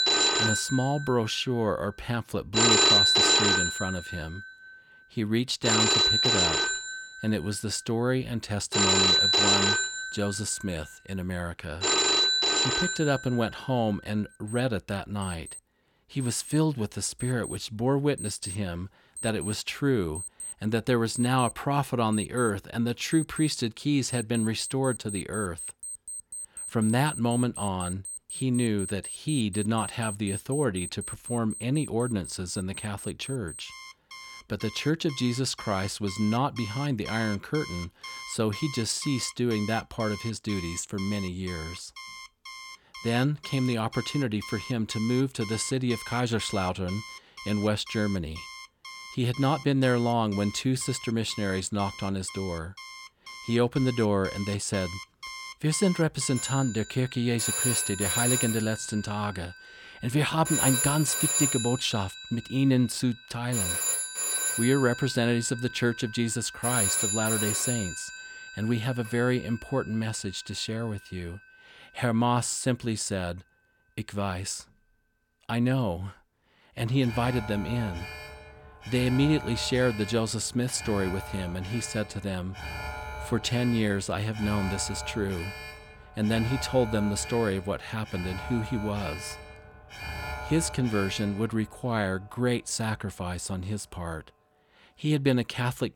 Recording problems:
alarms or sirens; very loud; throughout; as loud as the speech

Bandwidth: 17.5 kHz